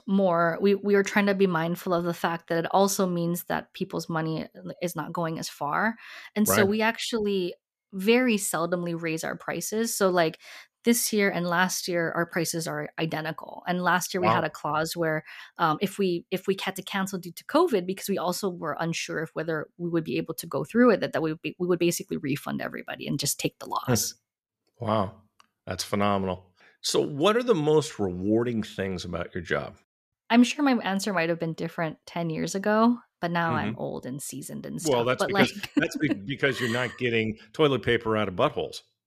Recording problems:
none

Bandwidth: 14.5 kHz